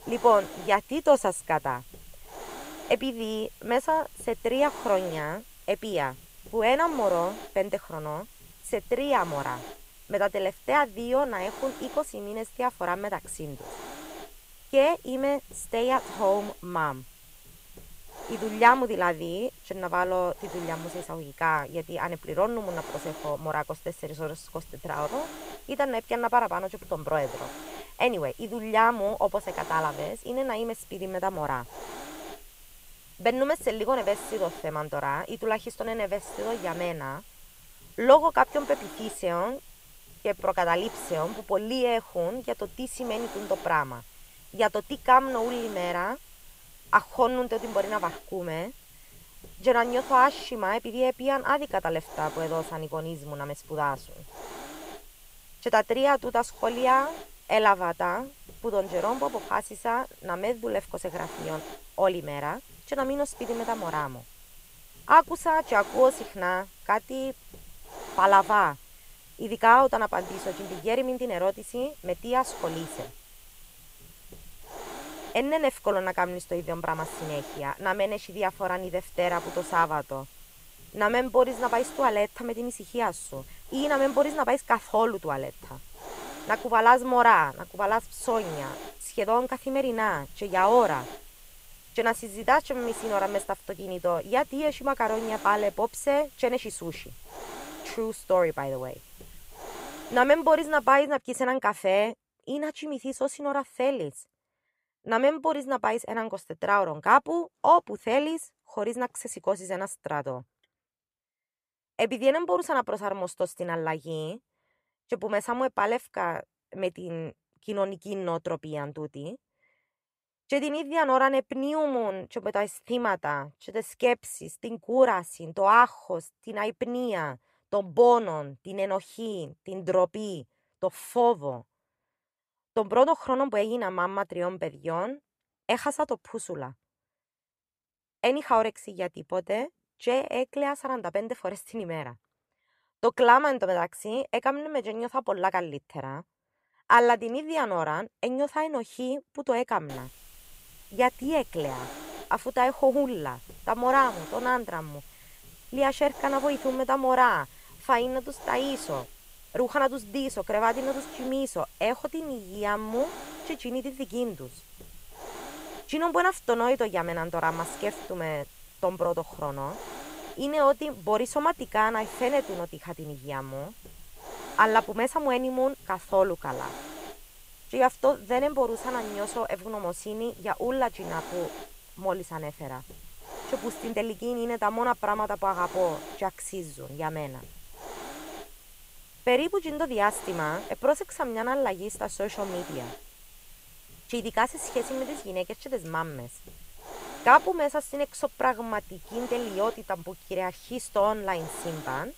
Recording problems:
hiss; noticeable; until 1:41 and from 2:30 on; 15 dB below the speech

